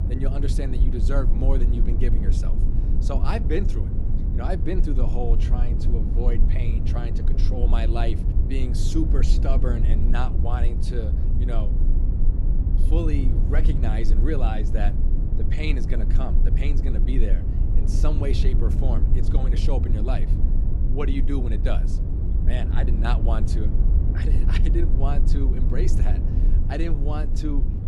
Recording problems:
low rumble; loud; throughout; 5 dB below the speech

